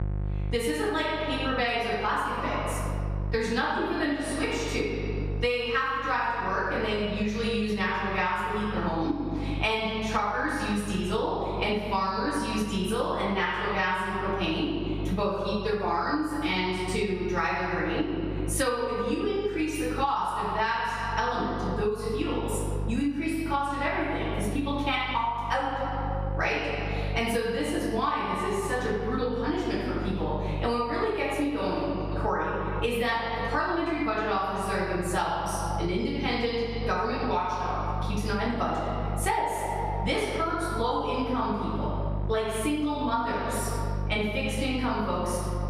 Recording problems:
room echo; strong; dies away in 1.5 s
off-mic speech; far
squashed, flat; somewhat
electrical hum; faint; throughout; 50 Hz, 20 dB below the speech

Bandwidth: 15 kHz